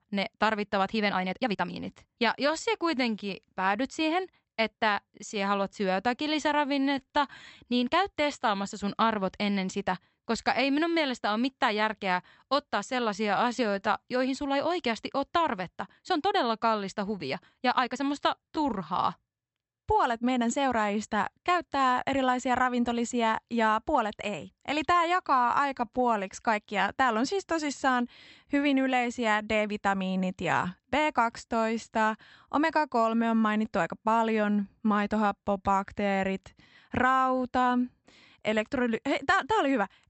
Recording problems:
high frequencies cut off; noticeable; nothing above 8 kHz
uneven, jittery; strongly; from 1 to 36 s

